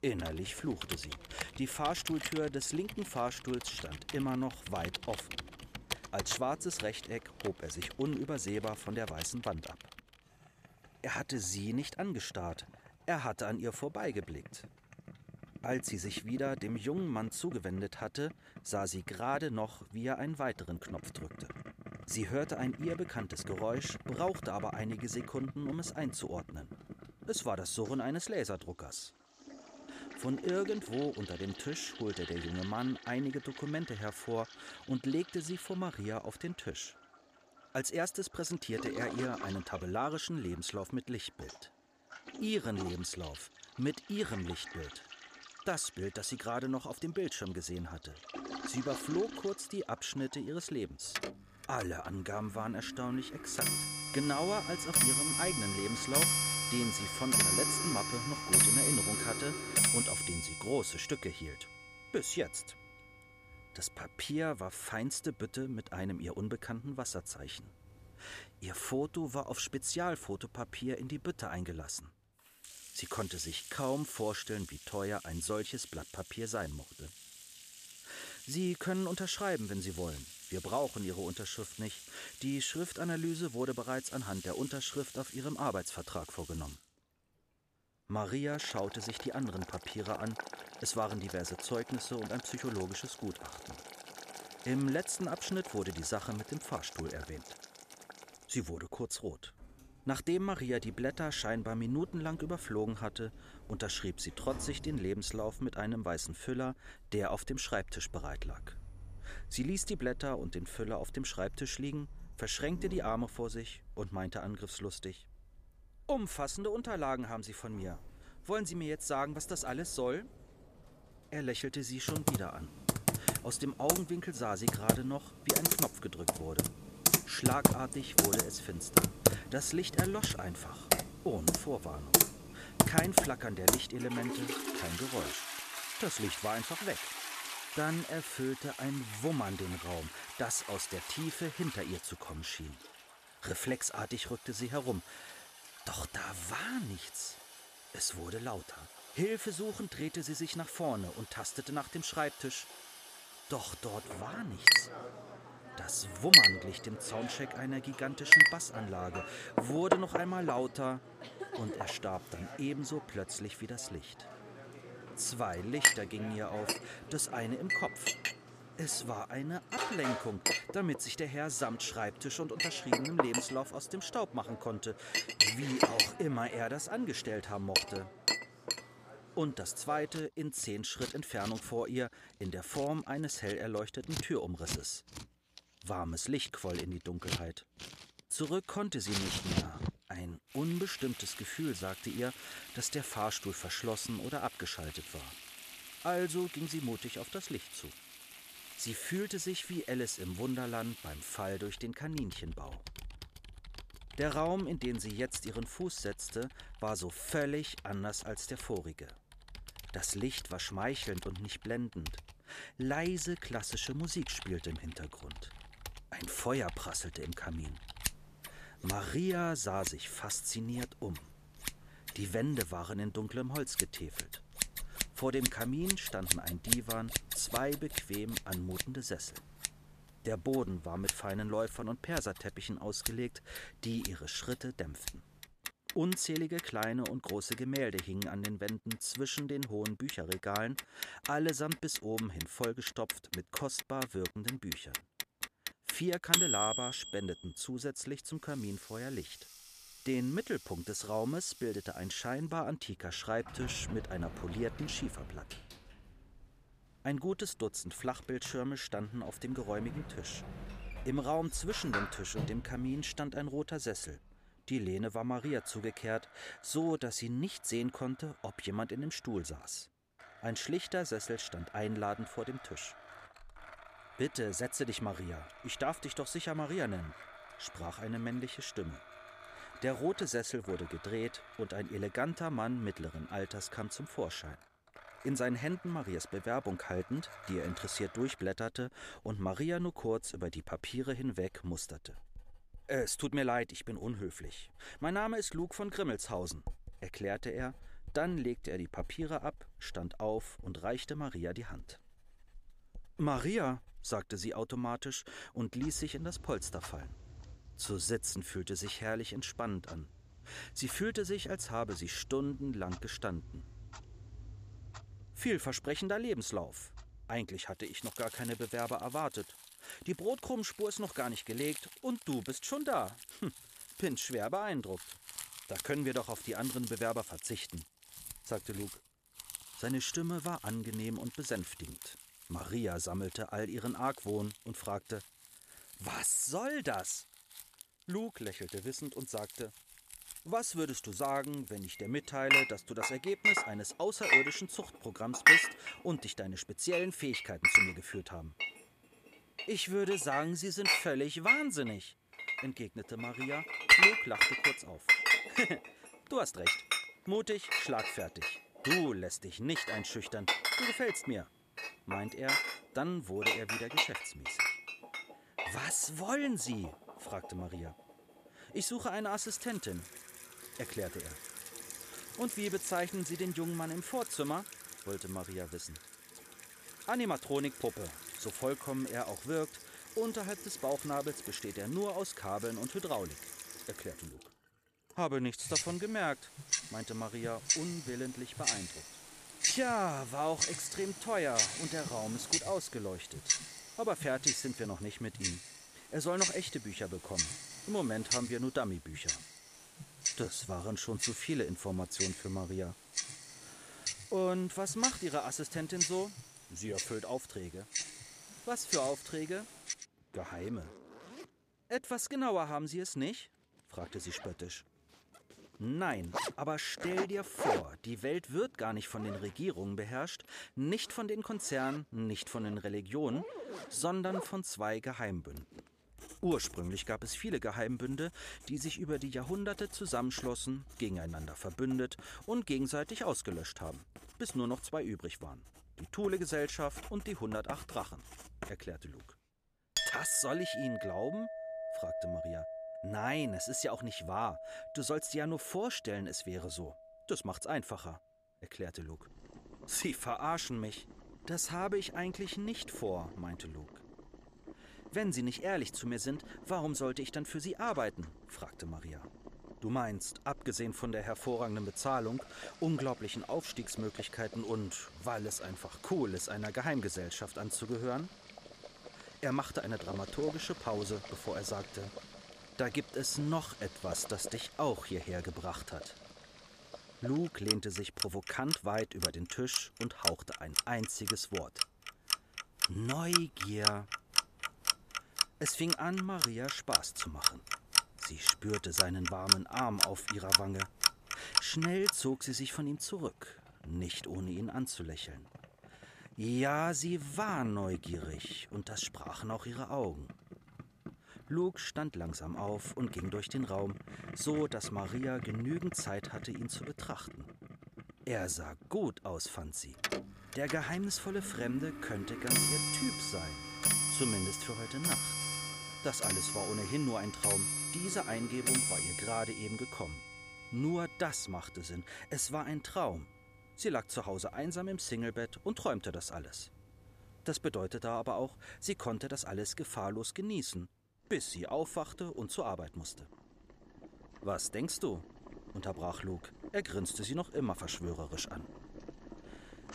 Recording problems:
household noises; very loud; throughout; 4 dB above the speech

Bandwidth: 14.5 kHz